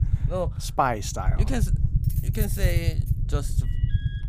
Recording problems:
low rumble; noticeable; throughout; 10 dB below the speech
jangling keys; noticeable; from 2 to 3 s; peak 9 dB below the speech
alarm; faint; at 3.5 s; peak 15 dB below the speech

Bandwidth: 15 kHz